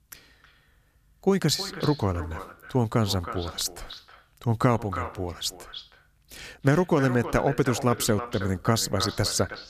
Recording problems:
echo of what is said; strong; throughout; 320 ms later, 10 dB below the speech

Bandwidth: 14.5 kHz